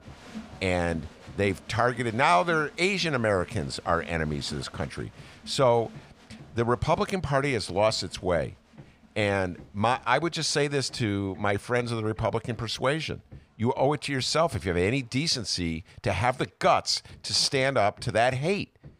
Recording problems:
crowd noise; faint; throughout; 20 dB below the speech
machinery noise; faint; throughout; 25 dB below the speech

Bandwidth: 15 kHz